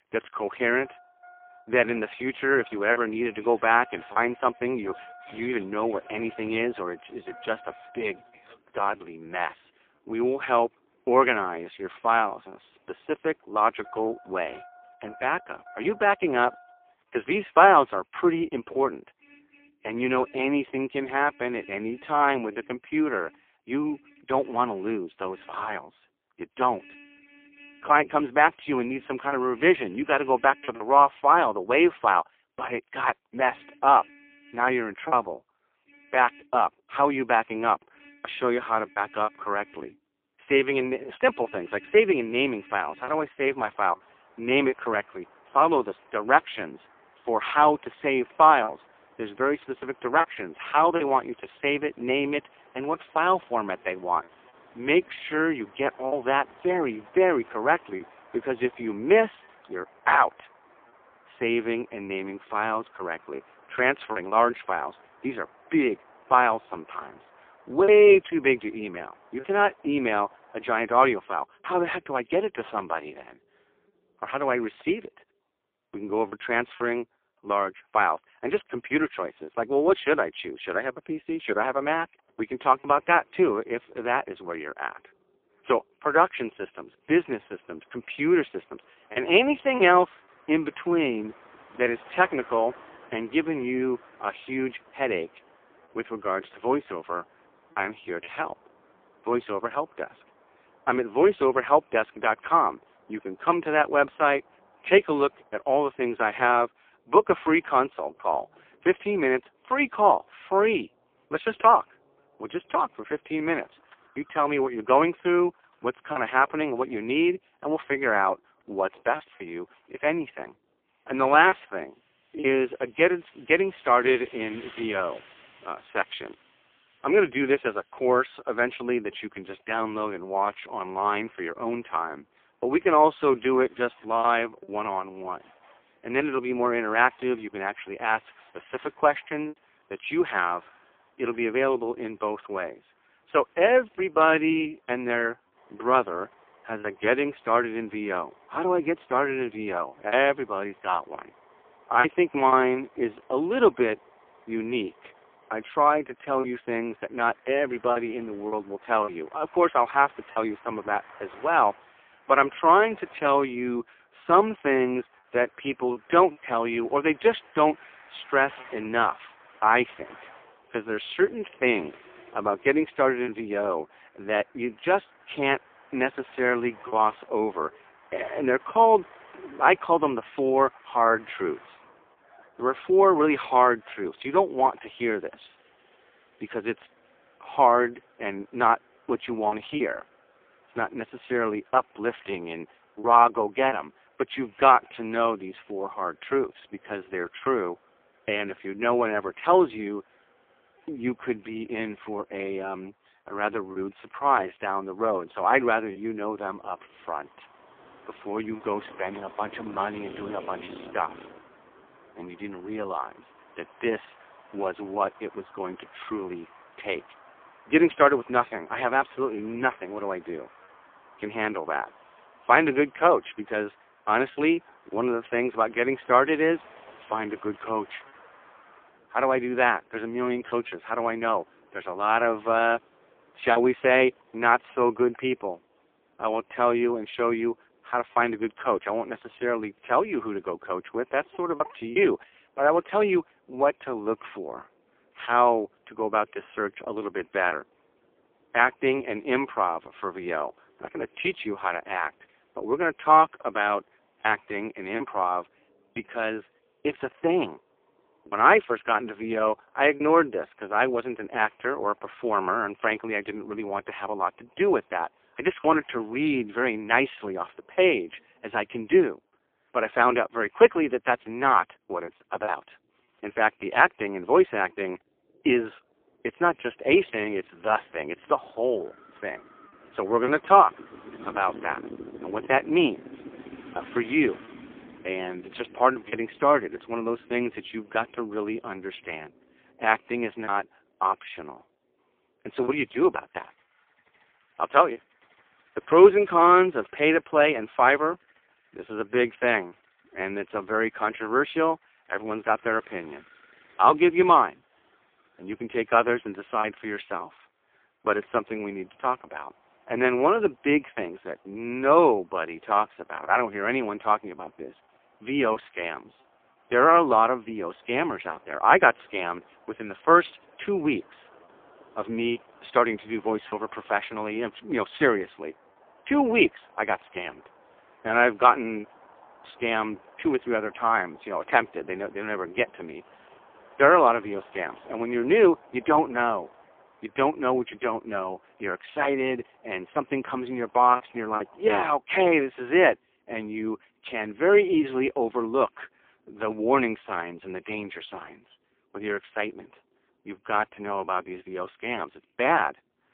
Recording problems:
phone-call audio; poor line
traffic noise; faint; throughout; 25 dB below the speech
choppy; occasionally; 2% of the speech affected

